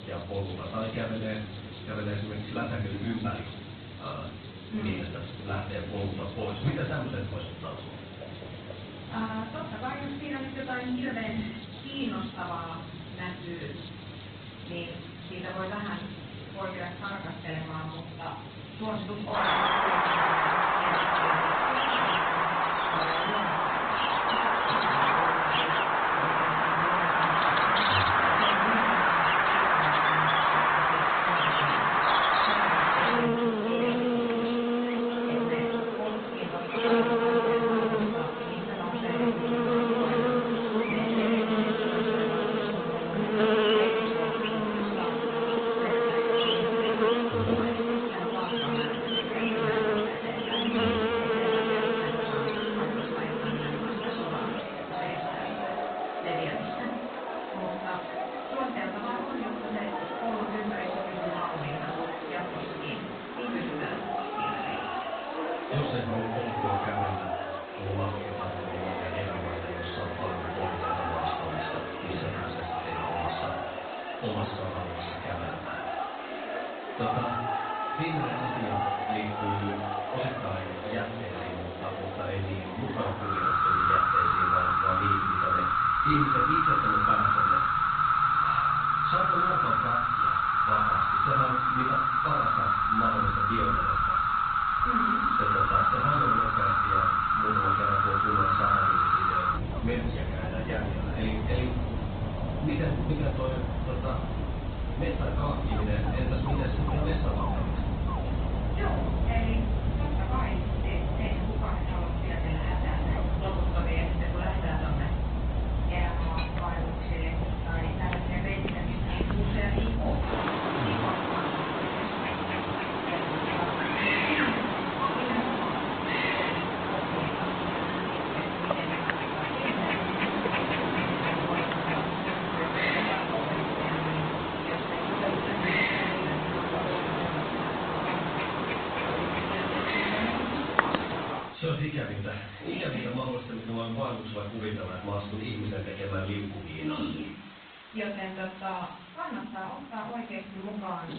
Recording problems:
off-mic speech; far
high frequencies cut off; severe; nothing above 4 kHz
room echo; noticeable; dies away in 0.6 s
garbled, watery; slightly
animal sounds; very loud; throughout; 8 dB above the speech
hiss; noticeable; throughout; 15 dB below the speech

